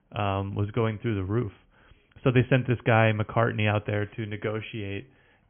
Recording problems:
high frequencies cut off; severe; nothing above 3.5 kHz

